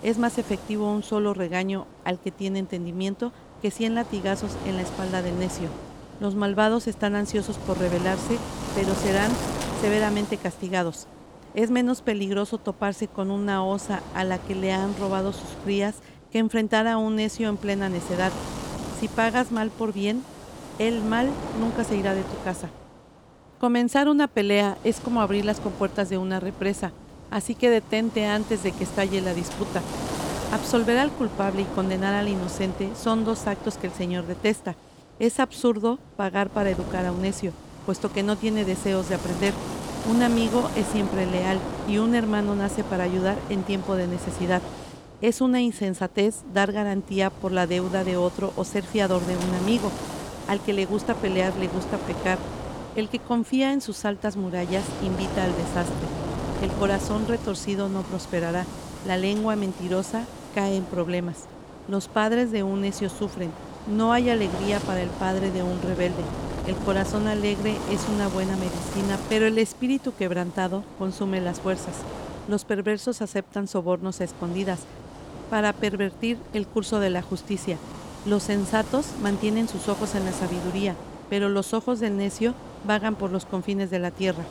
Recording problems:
wind noise on the microphone; heavy; 9 dB below the speech

